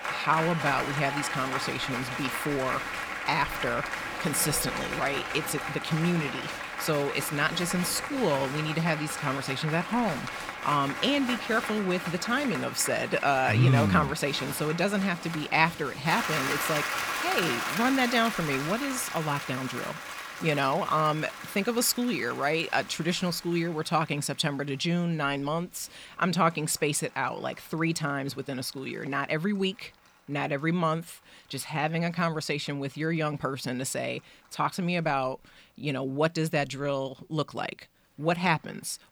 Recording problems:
crowd noise; loud; throughout; 5 dB below the speech

